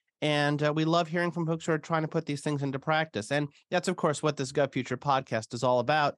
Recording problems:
none

